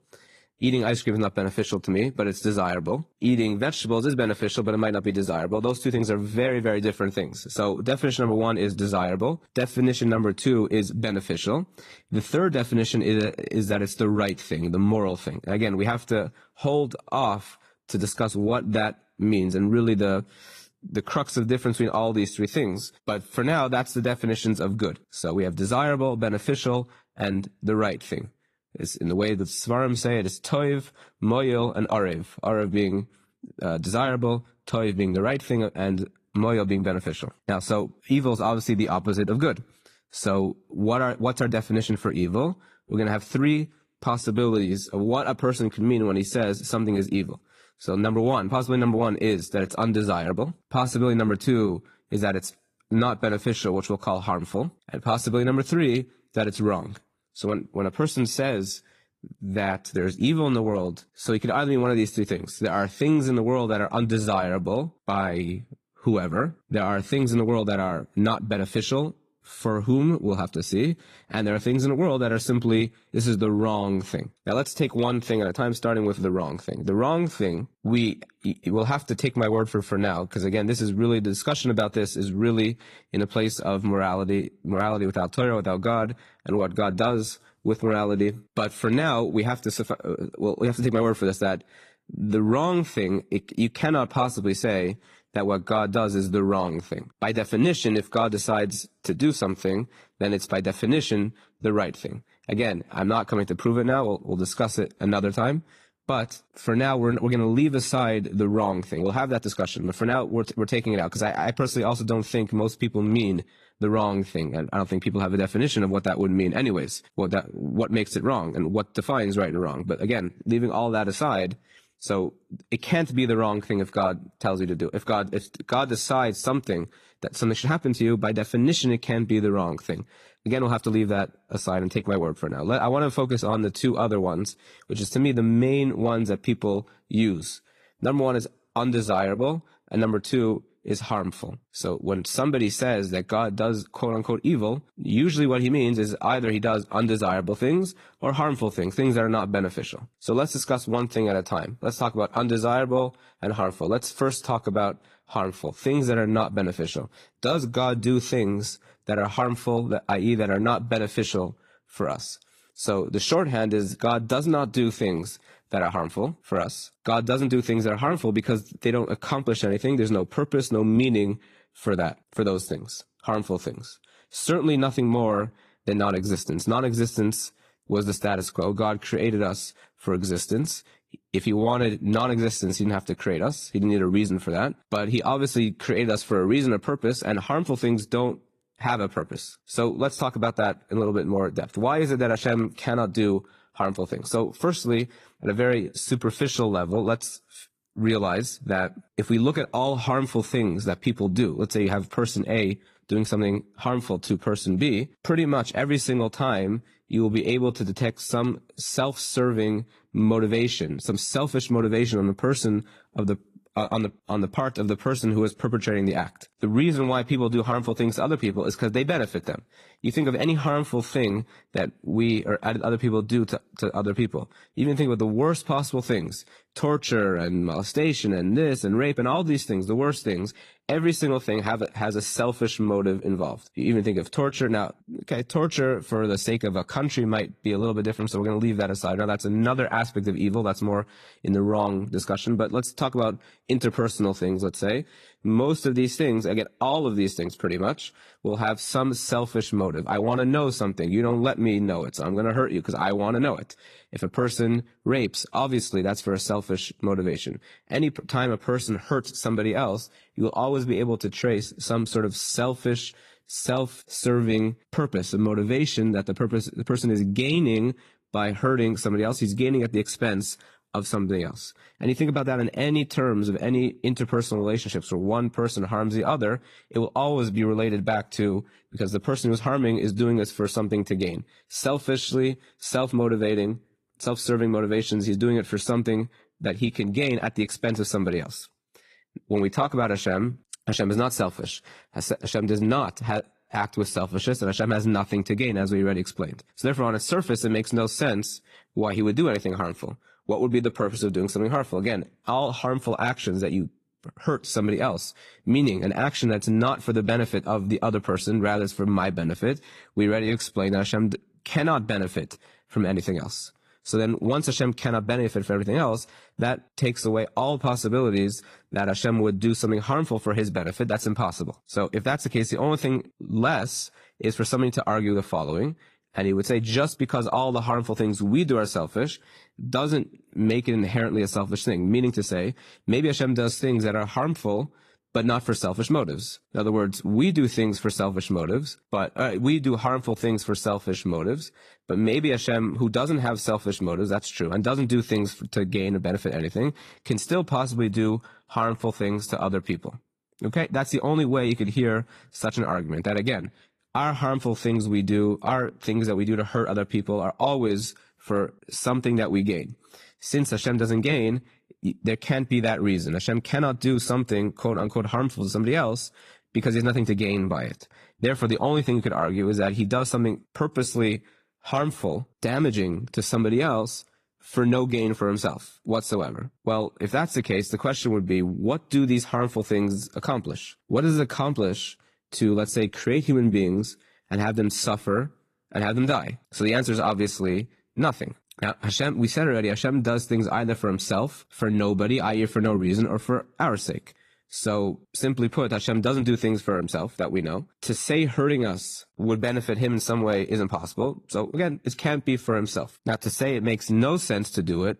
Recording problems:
garbled, watery; slightly

